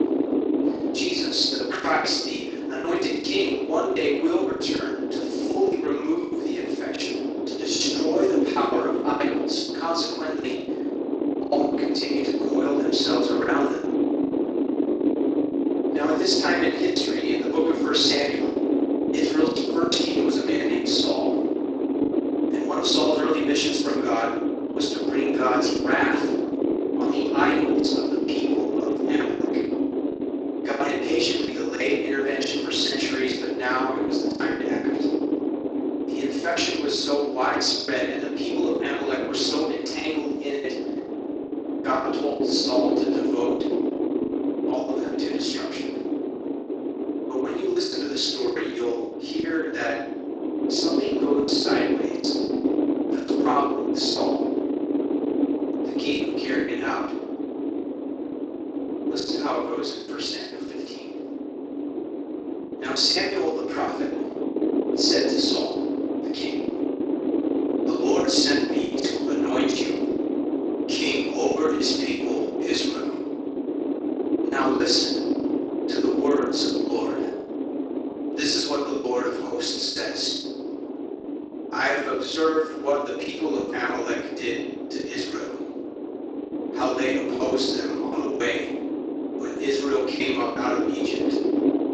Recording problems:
off-mic speech; far
room echo; noticeable; dies away in 0.7 s
thin; somewhat; fading below 300 Hz
garbled, watery; slightly; nothing above 7.5 kHz
wind noise on the microphone; heavy; 3 dB below the speech
choppy; very; 10% of the speech affected

